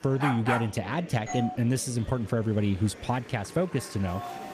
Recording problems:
murmuring crowd; noticeable; throughout; 15 dB below the speech
dog barking; noticeable; at the start; peak level with the speech
doorbell; noticeable; at 1.5 s; peak 7 dB below the speech
alarm; faint; at 4 s; peak 10 dB below the speech

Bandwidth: 14.5 kHz